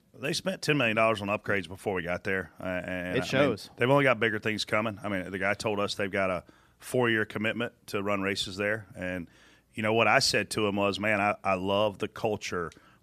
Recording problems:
none

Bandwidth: 14.5 kHz